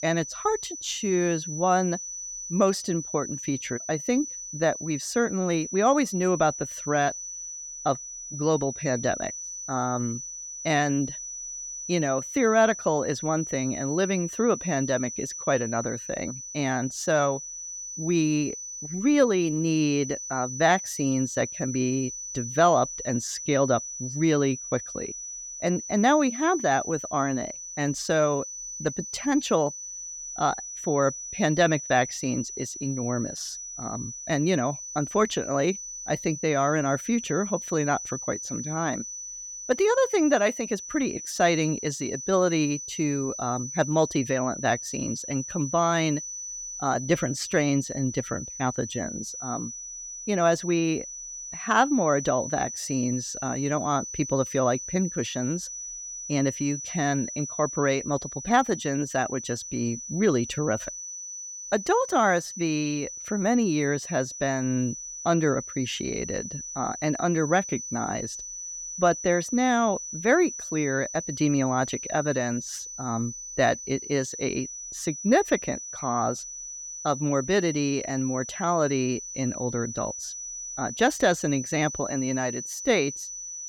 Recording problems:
high-pitched whine; loud; throughout; 6 kHz, 8 dB below the speech

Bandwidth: 18 kHz